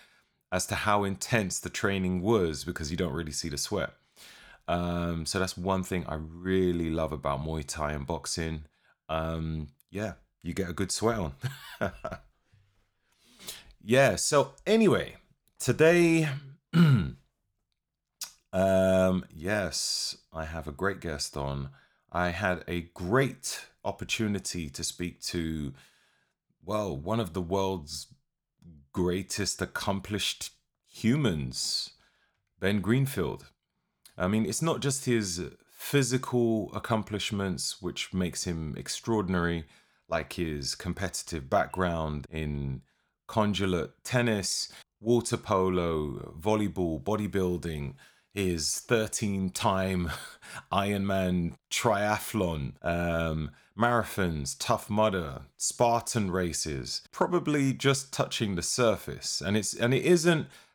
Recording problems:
none

